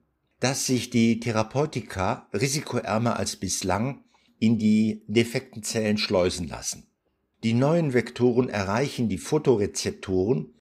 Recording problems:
none

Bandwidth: 15.5 kHz